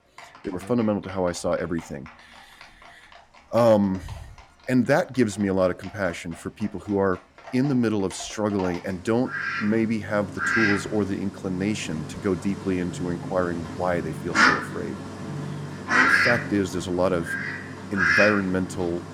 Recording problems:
animal sounds; loud; throughout; as loud as the speech

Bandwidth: 17 kHz